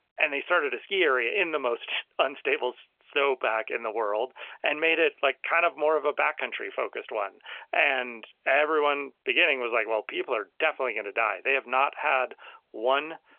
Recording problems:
phone-call audio; nothing above 3 kHz

